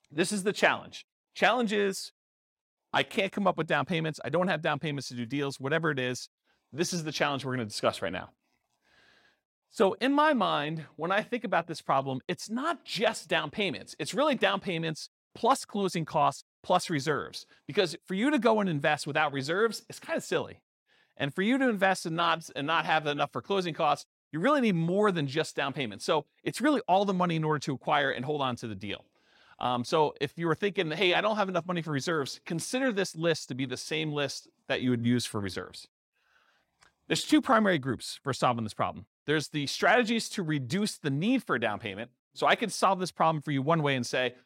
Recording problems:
none

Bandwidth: 16.5 kHz